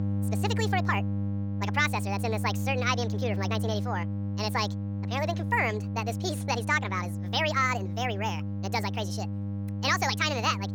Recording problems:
wrong speed and pitch; too fast and too high; 1.6 times normal speed
electrical hum; noticeable; throughout; 50 Hz, 15 dB below the speech

